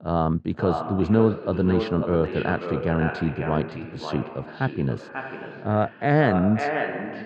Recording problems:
echo of what is said; strong; throughout; 540 ms later, 7 dB below the speech
muffled; very; fading above 2 kHz

